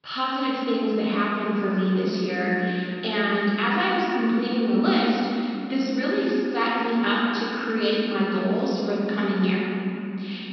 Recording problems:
room echo; strong; dies away in 3 s
off-mic speech; far
high frequencies cut off; noticeable; nothing above 5.5 kHz

